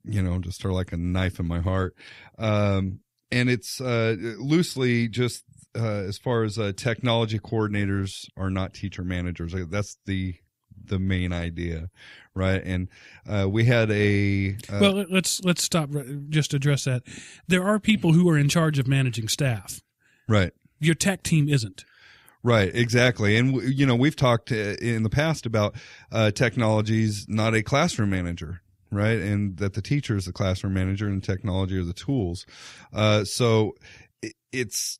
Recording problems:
none

